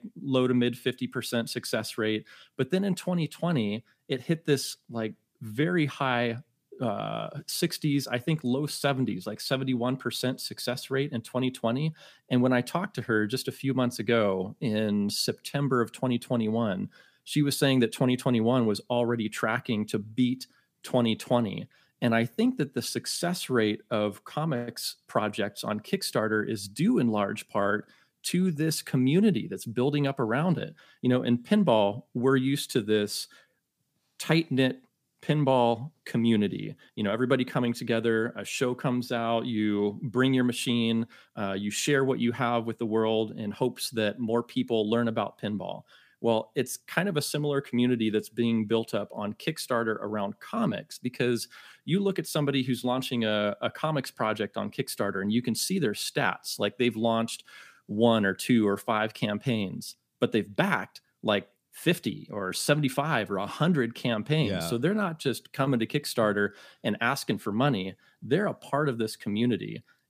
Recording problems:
none

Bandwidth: 15 kHz